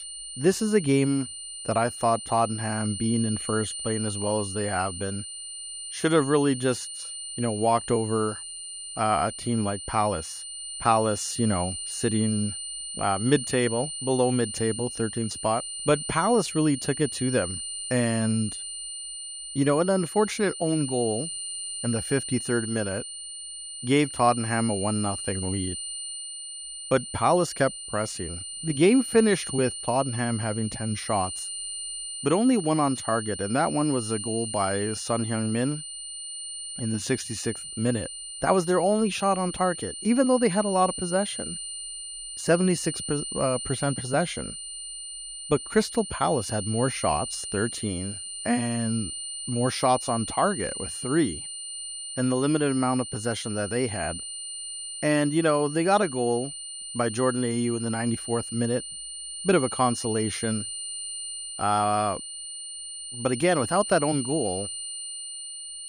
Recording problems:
high-pitched whine; loud; throughout; 9 kHz, 7 dB below the speech

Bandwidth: 15.5 kHz